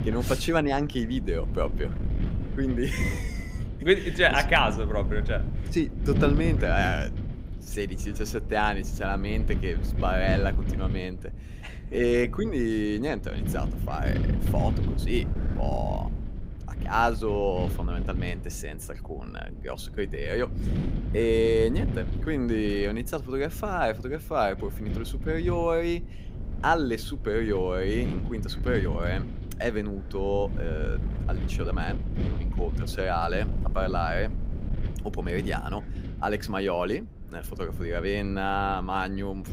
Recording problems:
wind noise on the microphone; occasional gusts; 15 dB below the speech

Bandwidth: 15.5 kHz